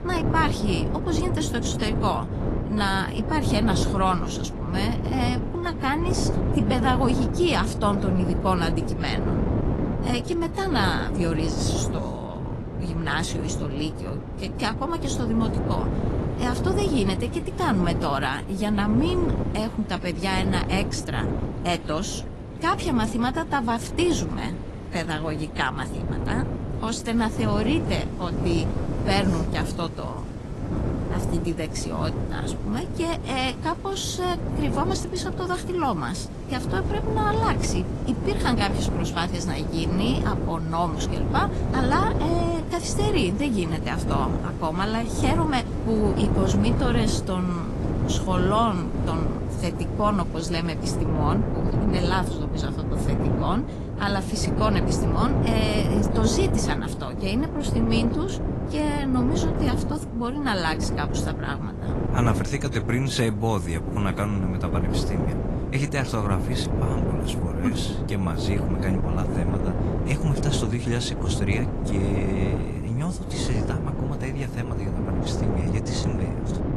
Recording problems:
garbled, watery; slightly; nothing above 11.5 kHz
wind noise on the microphone; heavy; 6 dB below the speech
rain or running water; faint; throughout; 25 dB below the speech

